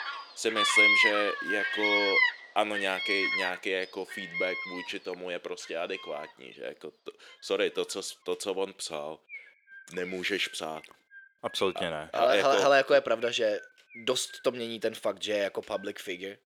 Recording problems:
thin; somewhat; fading below 400 Hz
animal sounds; very loud; throughout; 4 dB above the speech

